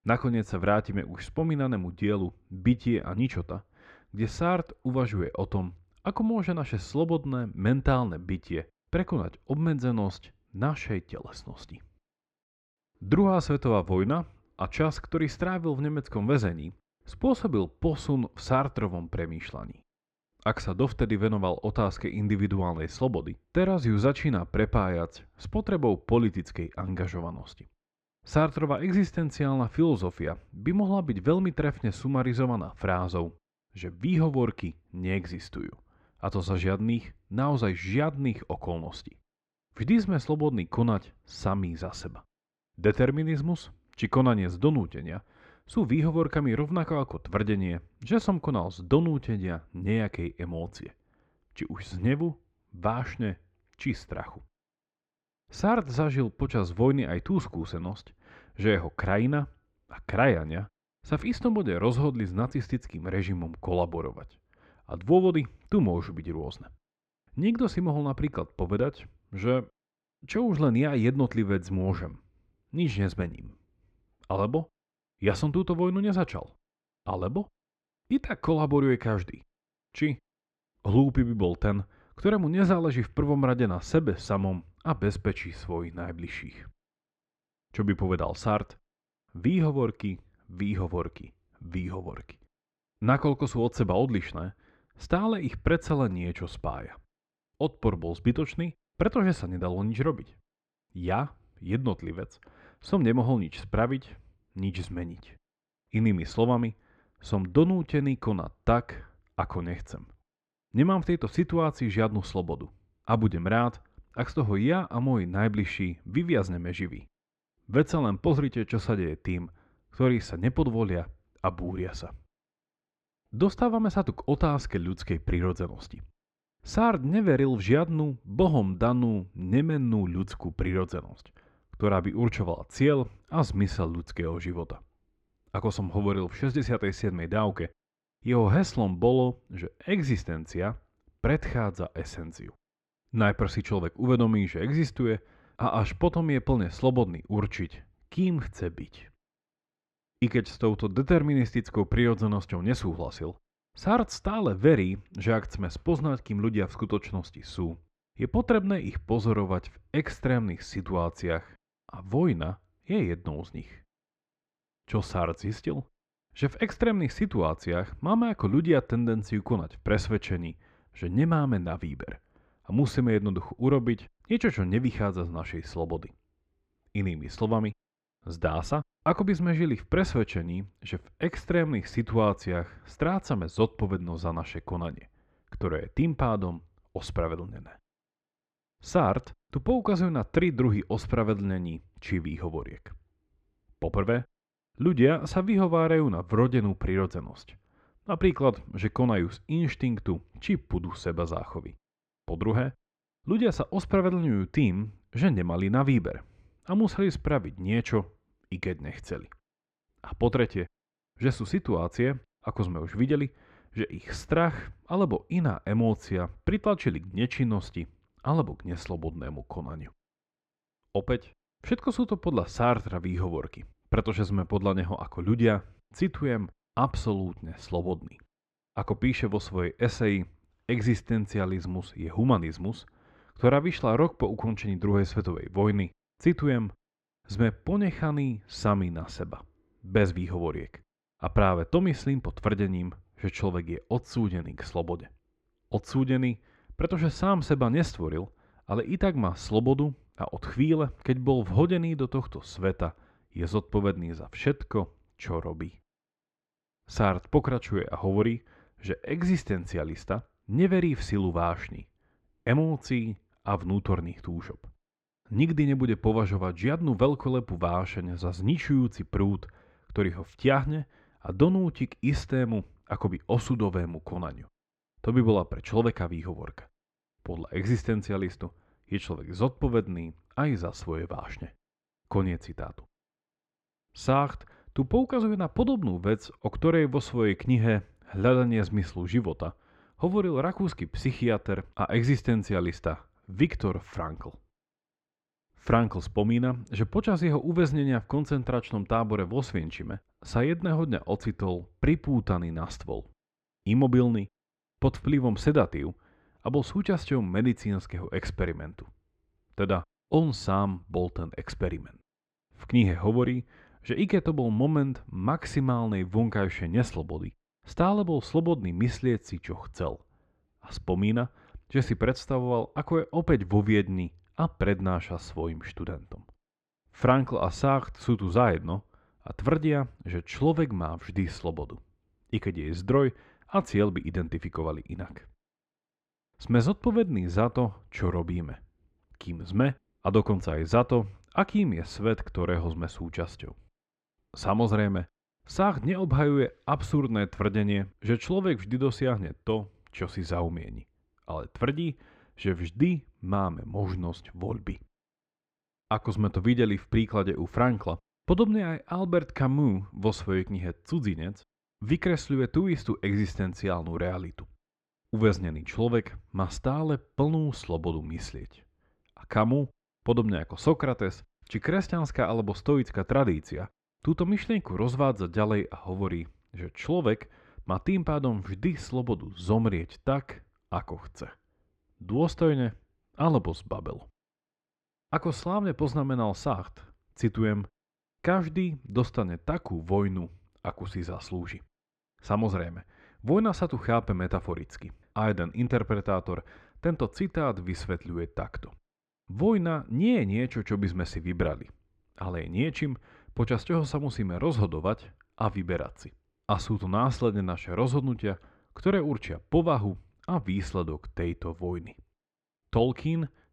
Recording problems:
muffled; slightly; fading above 3 kHz

